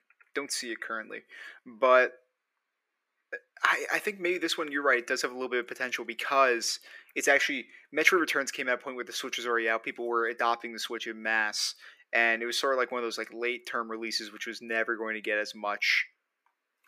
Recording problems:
thin; very; fading below 300 Hz

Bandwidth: 15 kHz